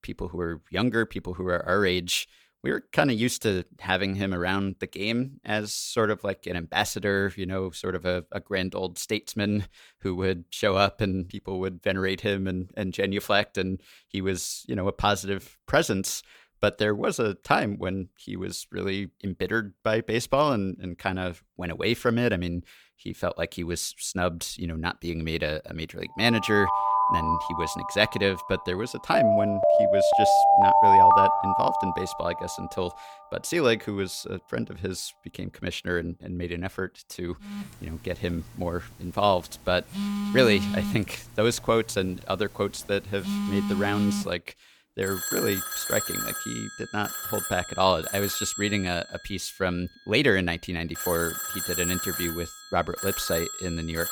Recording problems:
alarms or sirens; very loud; from 27 s on; 3 dB above the speech

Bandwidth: 19 kHz